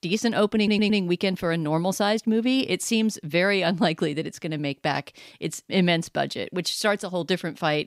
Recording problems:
audio stuttering; at 0.5 s

